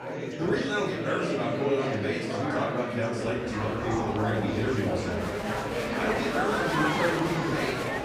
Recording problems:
off-mic speech; far
room echo; noticeable; dies away in 0.7 s
chatter from many people; loud; throughout; 1 dB below the speech
train or aircraft noise; noticeable; throughout; 15 dB below the speech

